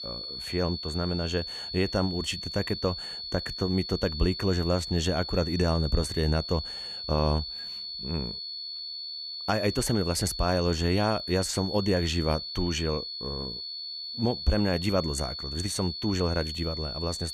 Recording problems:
high-pitched whine; loud; throughout; 4.5 kHz, 5 dB below the speech

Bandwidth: 14.5 kHz